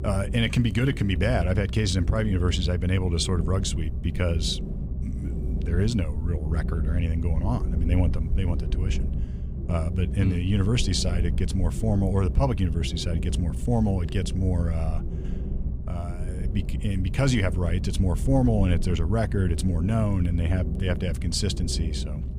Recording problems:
low rumble; noticeable; throughout; 10 dB below the speech

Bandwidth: 15.5 kHz